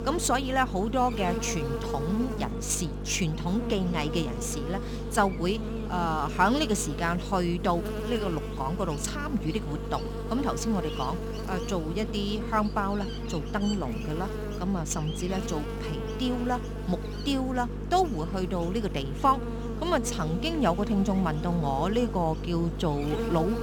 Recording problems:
electrical hum; loud; throughout; 50 Hz, 8 dB below the speech

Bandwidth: 18.5 kHz